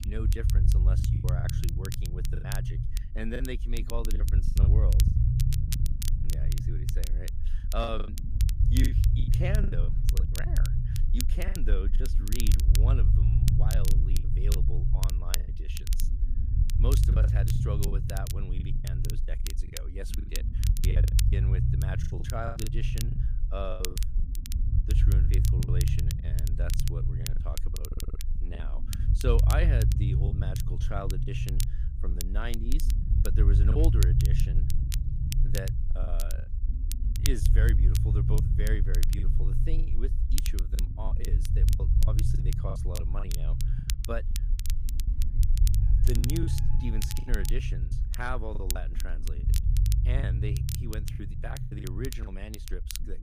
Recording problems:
low rumble; loud; throughout; 4 dB below the speech
crackle, like an old record; loud; 3 dB below the speech
household noises; faint; throughout; 25 dB below the speech
choppy; very; 11% of the speech affected
audio stuttering; at 28 s

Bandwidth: 15 kHz